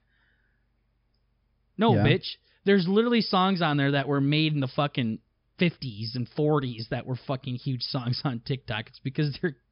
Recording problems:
high frequencies cut off; noticeable; nothing above 5.5 kHz

